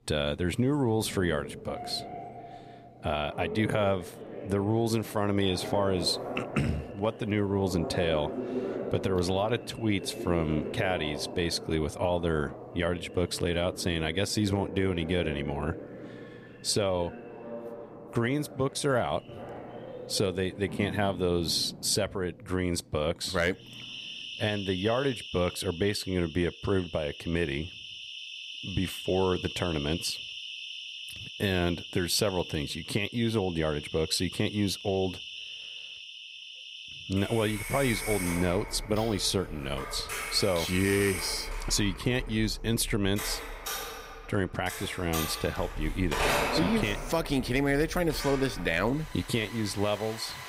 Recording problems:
alarms or sirens; loud; throughout; 9 dB below the speech

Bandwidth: 15.5 kHz